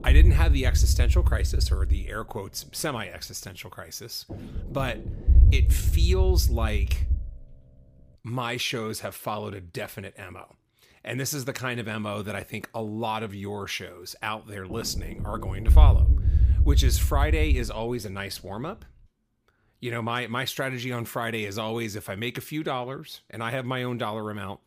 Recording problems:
low rumble; noticeable; until 8 s and from 14 to 19 s; 10 dB below the speech

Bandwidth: 15 kHz